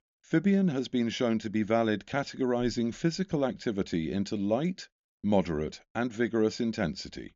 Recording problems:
high frequencies cut off; noticeable; nothing above 7 kHz

